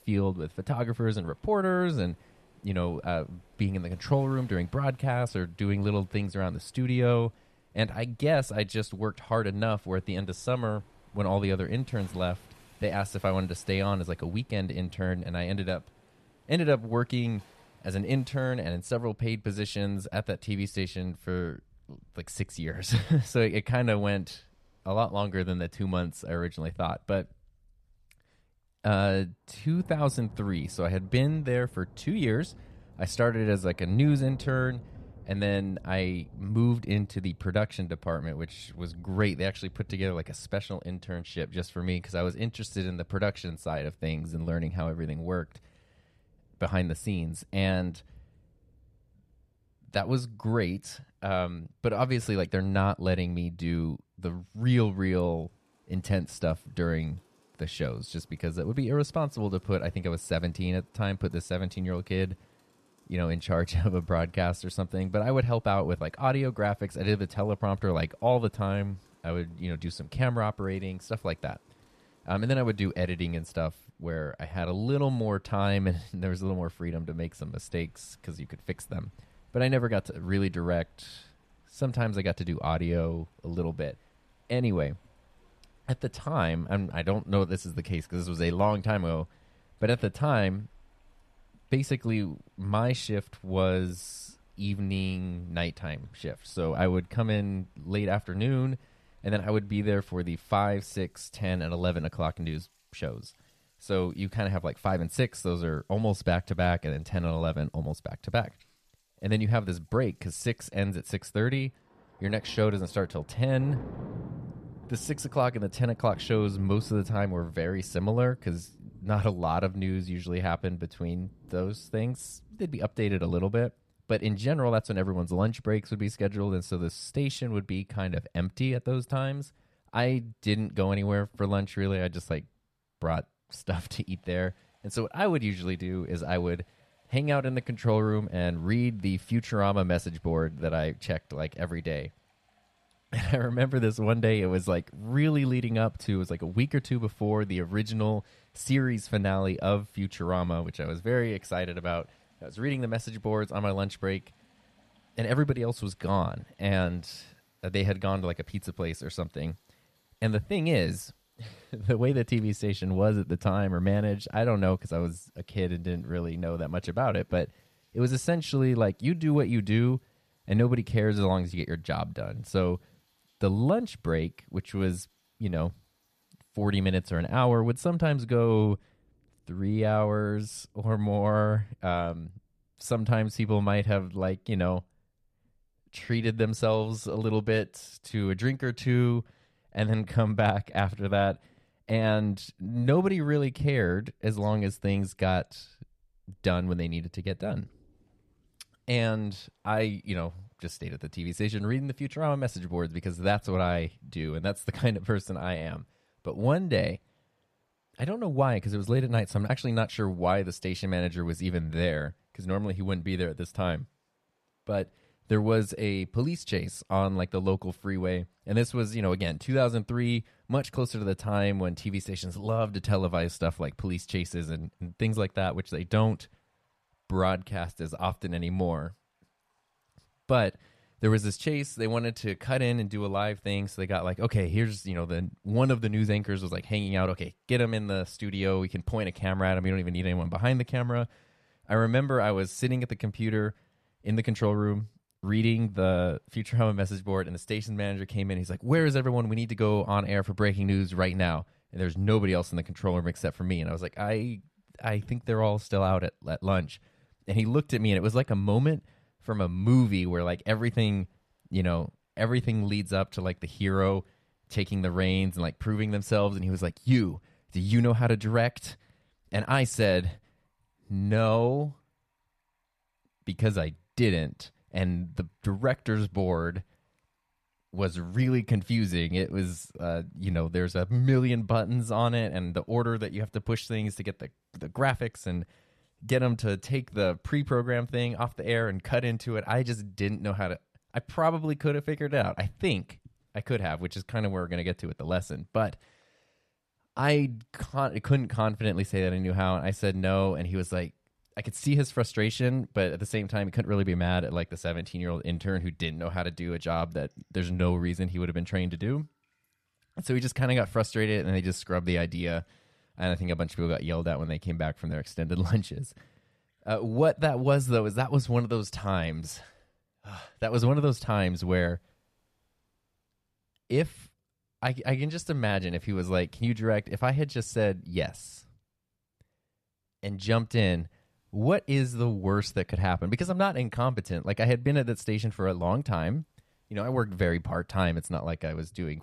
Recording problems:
rain or running water; faint; throughout; 25 dB below the speech

